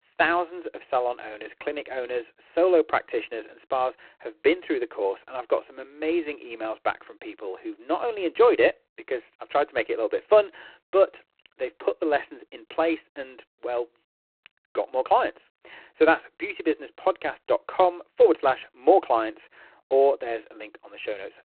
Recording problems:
phone-call audio; poor line; nothing above 4 kHz

